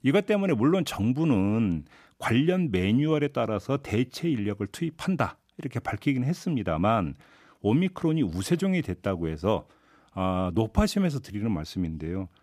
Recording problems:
none

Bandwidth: 14.5 kHz